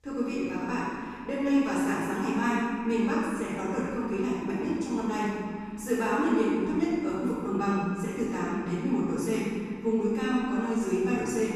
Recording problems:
room echo; strong; dies away in 2 s
off-mic speech; far

